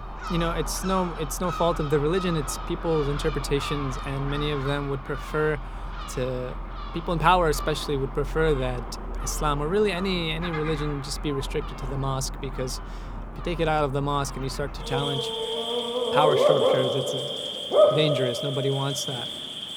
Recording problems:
animal sounds; loud; throughout; 2 dB below the speech

